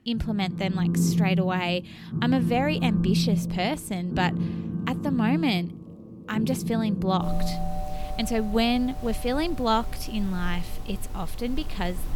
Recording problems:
alarms or sirens; loud; throughout; 2 dB below the speech

